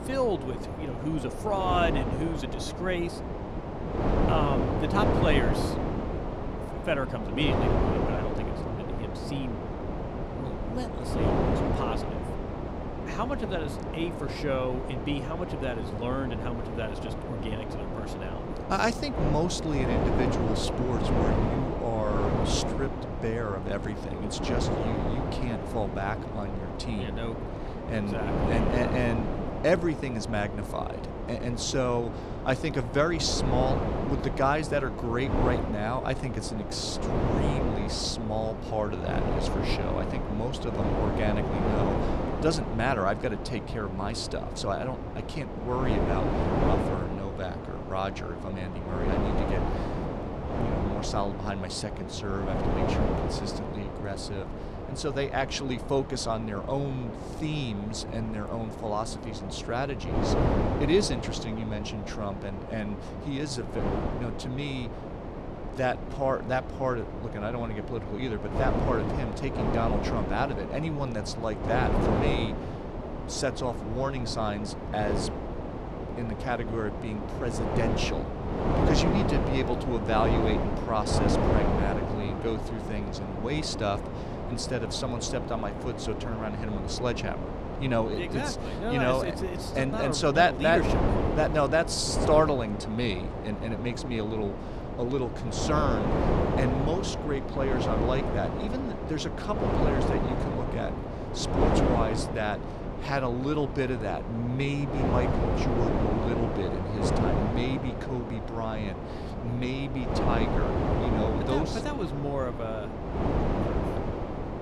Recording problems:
wind noise on the microphone; heavy; 2 dB below the speech

